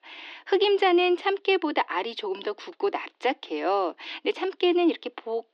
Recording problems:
thin; somewhat; fading below 300 Hz
muffled; very slightly; fading above 3.5 kHz

